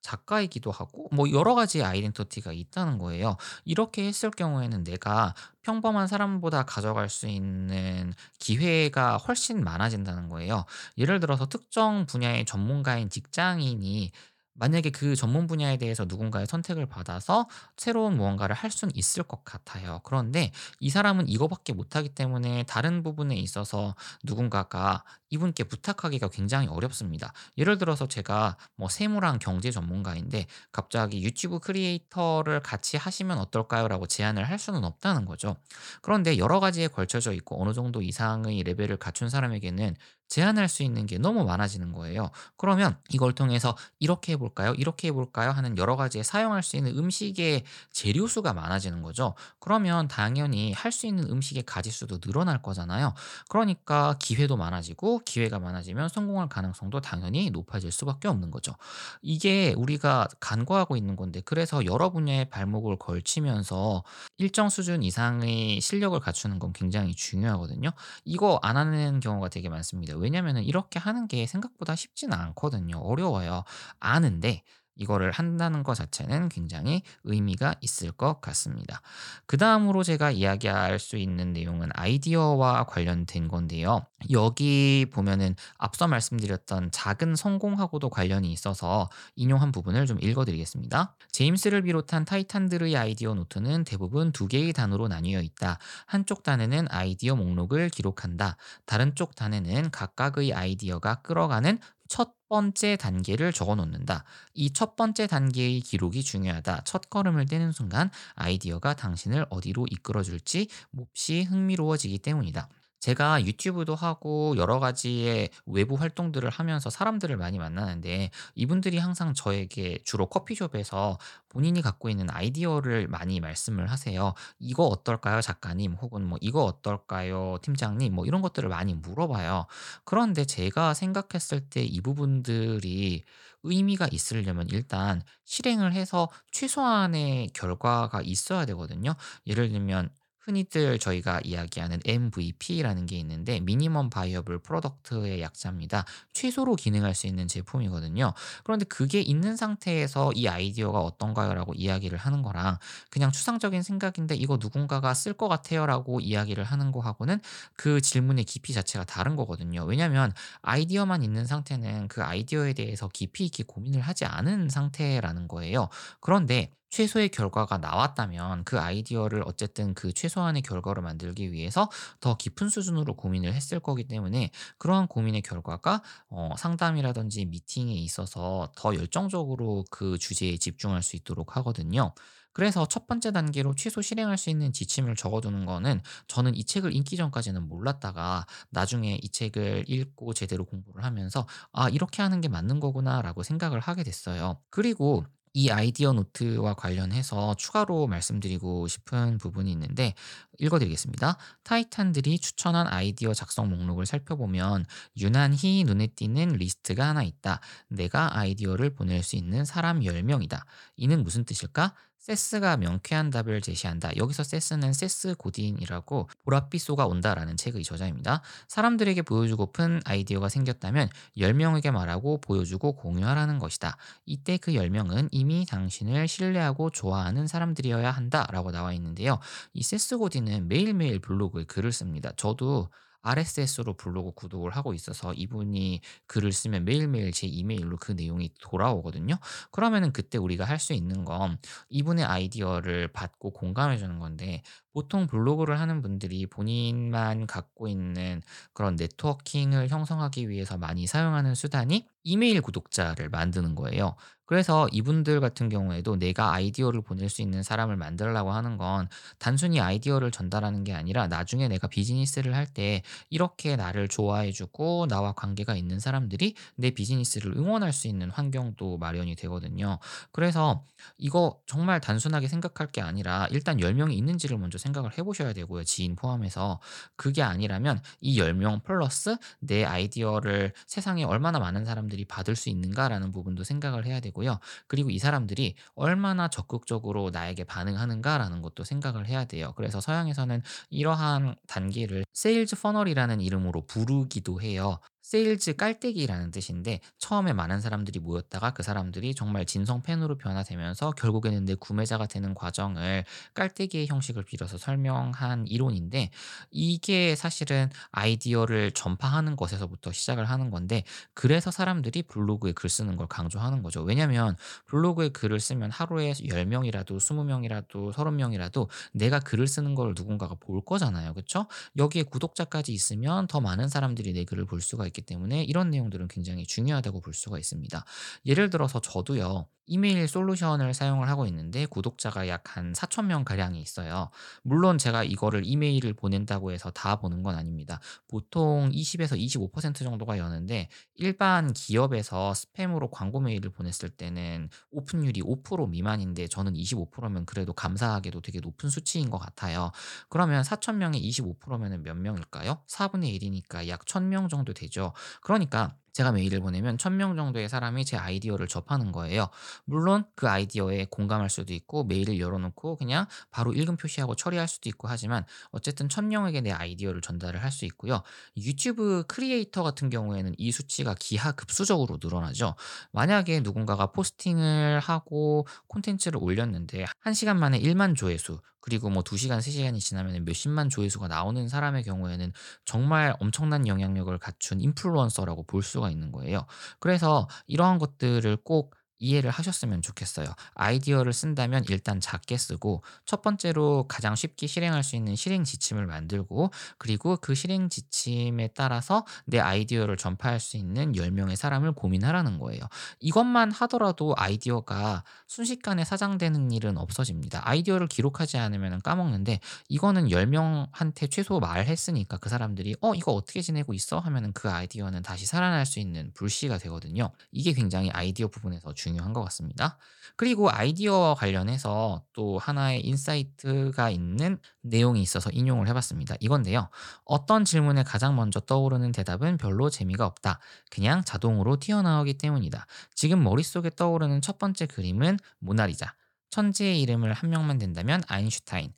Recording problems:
none

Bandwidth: 18 kHz